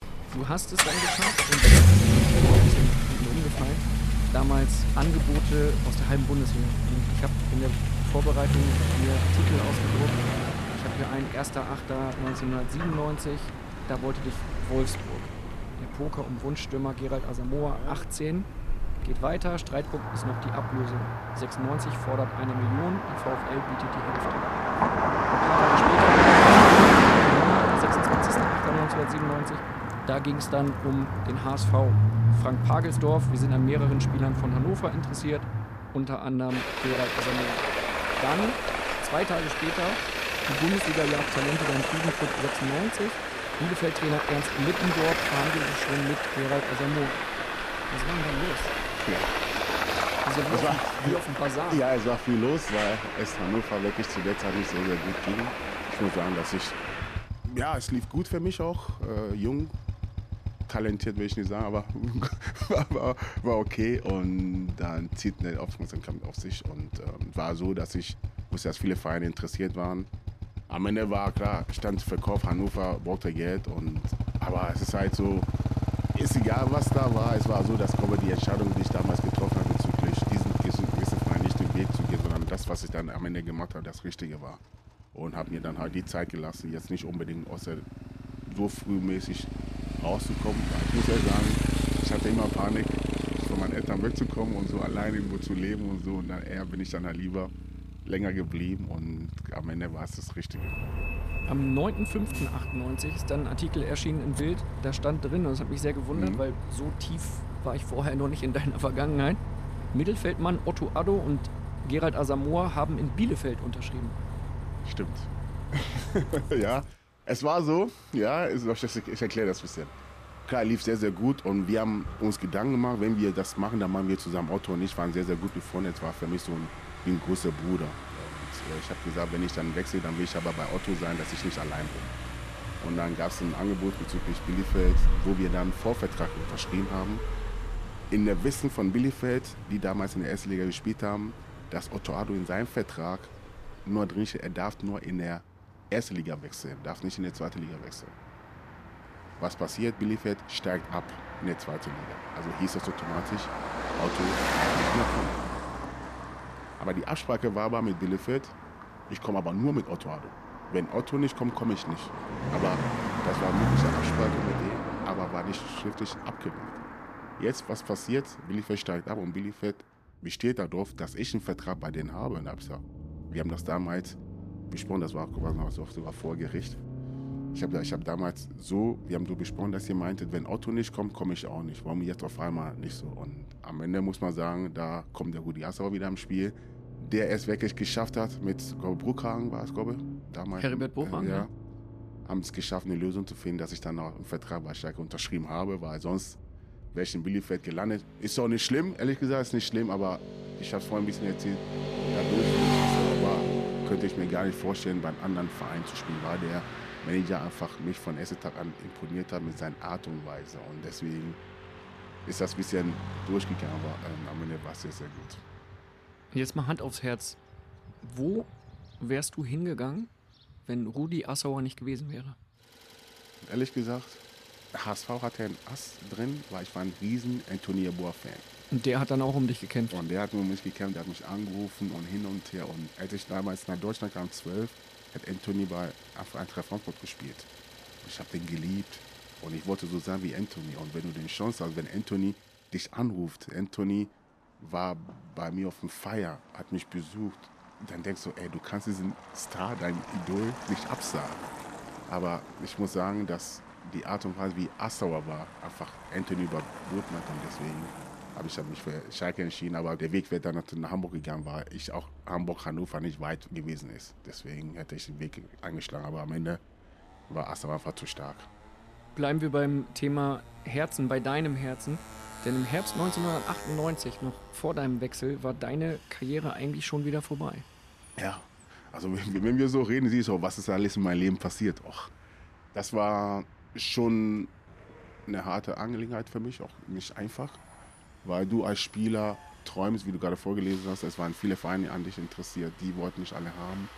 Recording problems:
traffic noise; very loud; throughout; 4 dB above the speech

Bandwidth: 14.5 kHz